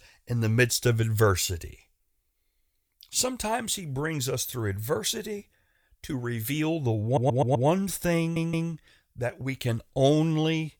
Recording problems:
audio stuttering; at 7 s and at 8 s

